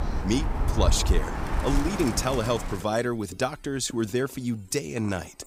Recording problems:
animal sounds; loud; throughout; 1 dB below the speech

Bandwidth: 15.5 kHz